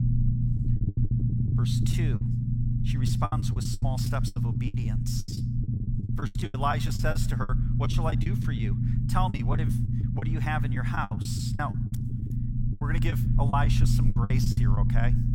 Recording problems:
low rumble; loud; throughout; 5 dB below the speech
choppy; very; 16% of the speech affected

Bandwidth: 17 kHz